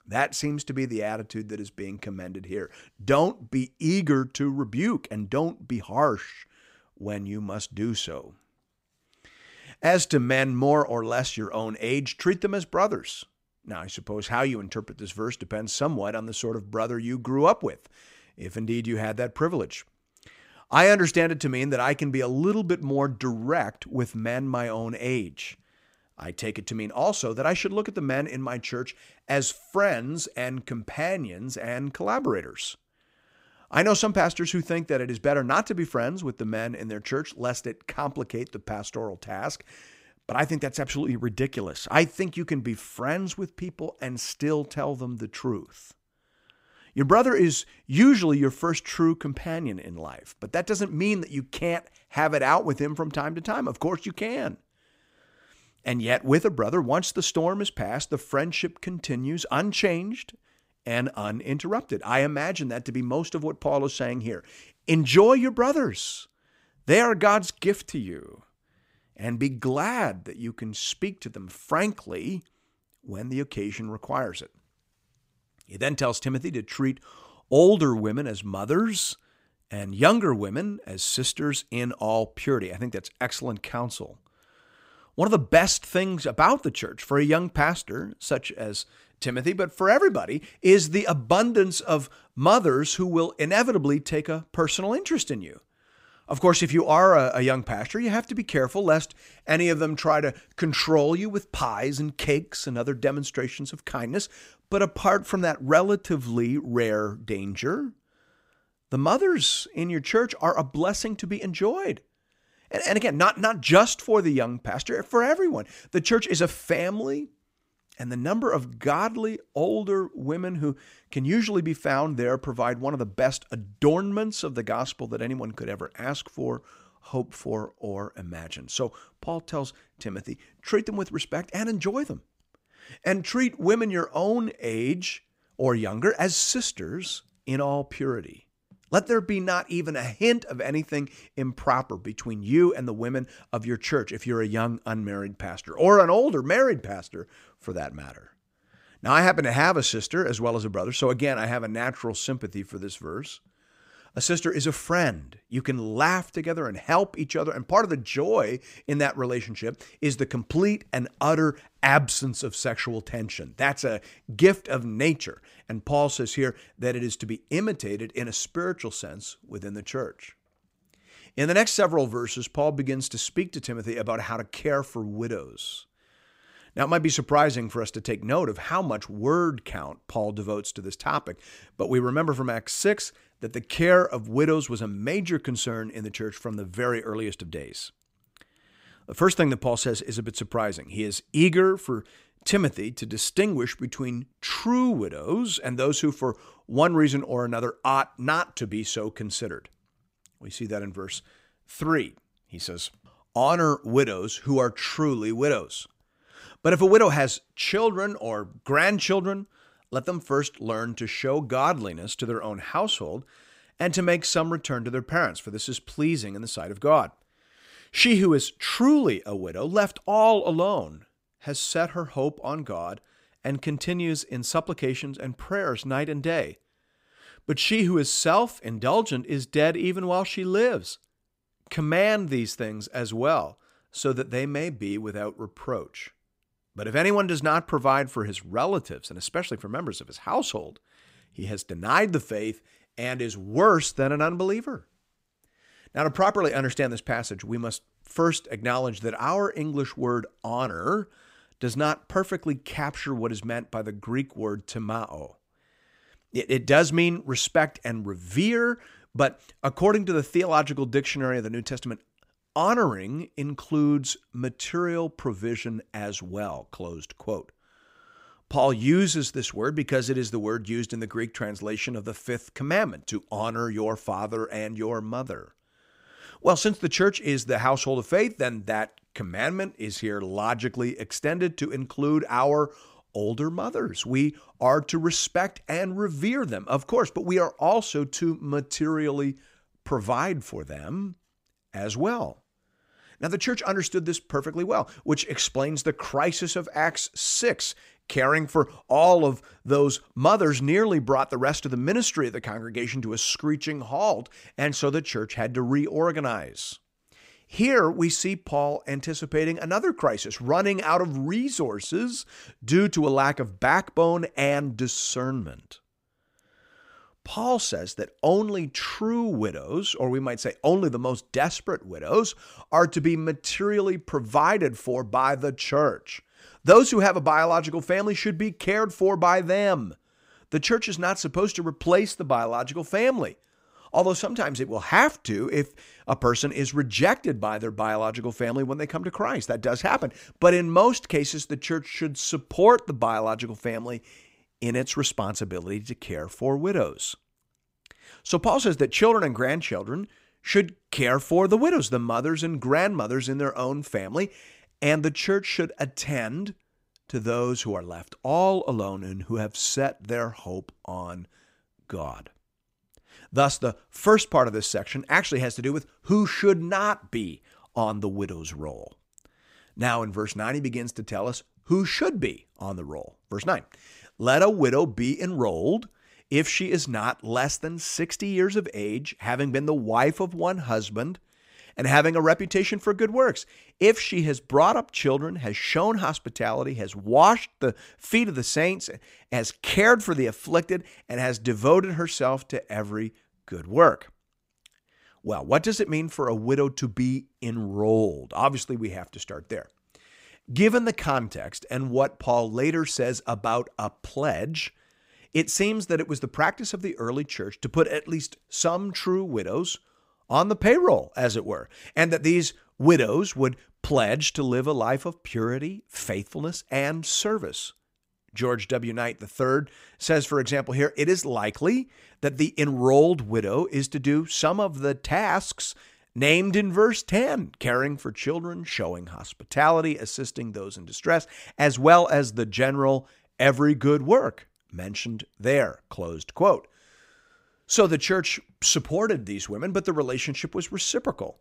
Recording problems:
none

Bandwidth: 15.5 kHz